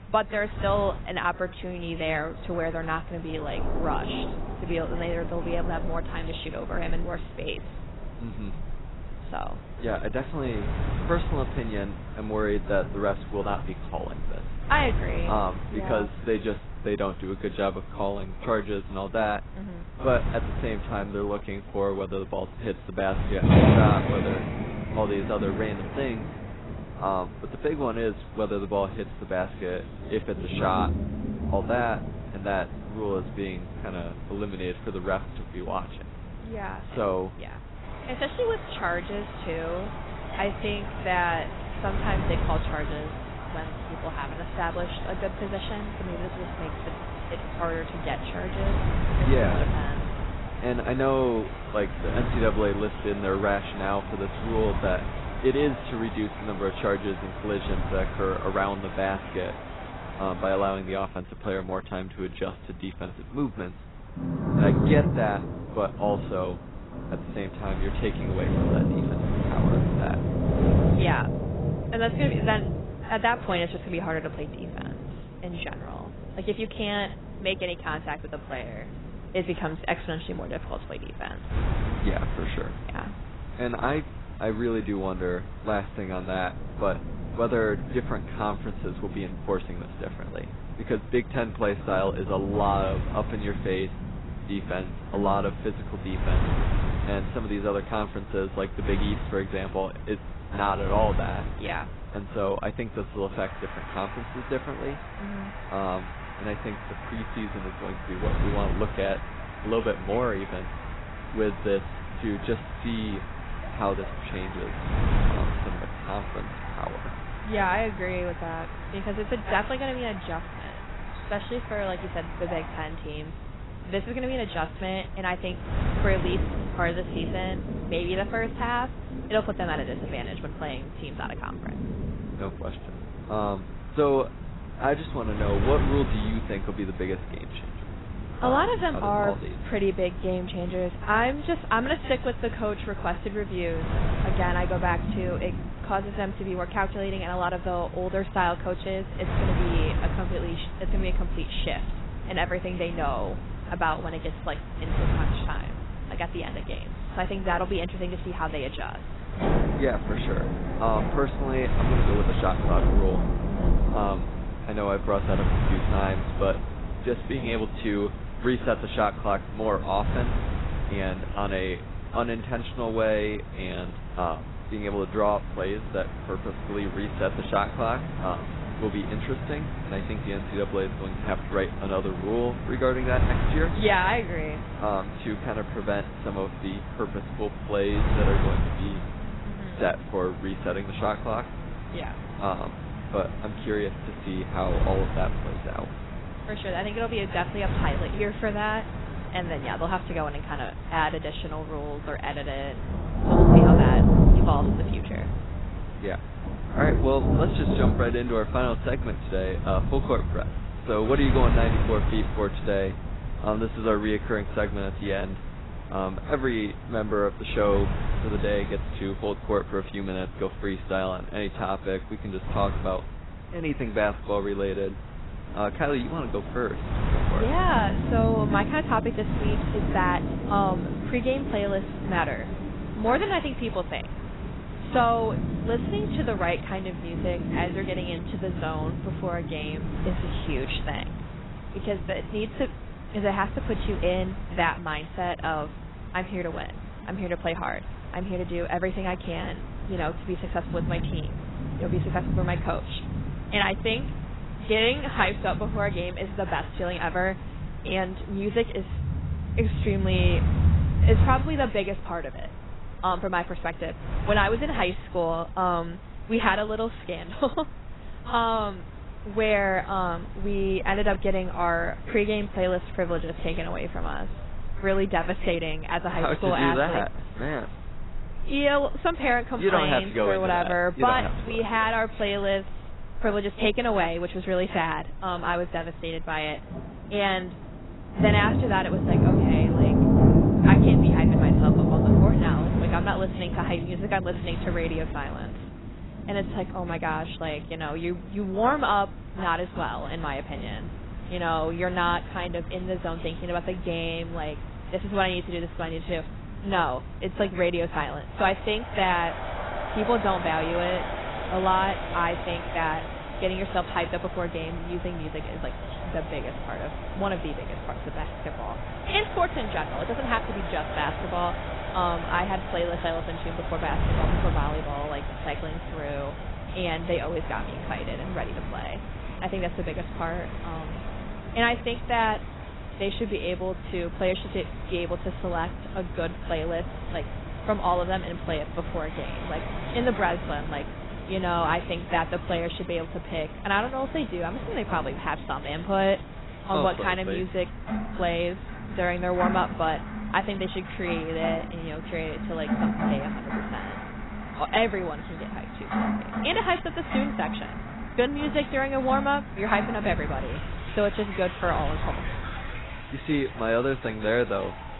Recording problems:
garbled, watery; badly; nothing above 4 kHz
rain or running water; loud; throughout; 2 dB below the speech
wind noise on the microphone; occasional gusts; 15 dB below the speech

